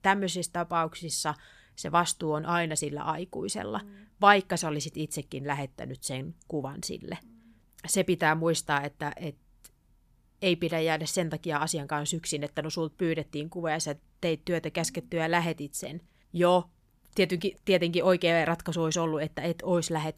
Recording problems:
none

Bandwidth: 15 kHz